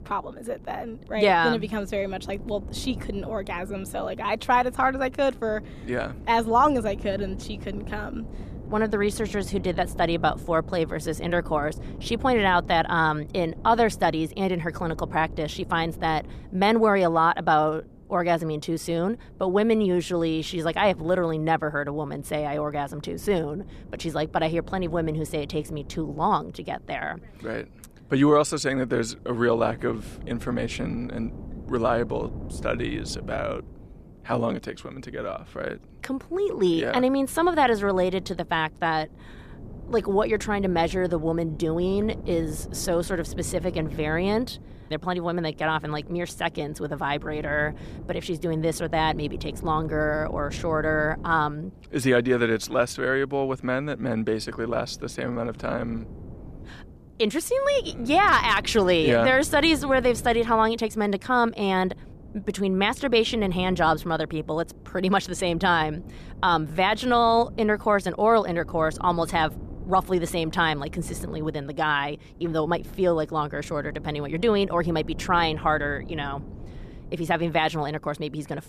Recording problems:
wind noise on the microphone; occasional gusts; 25 dB below the speech

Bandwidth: 14.5 kHz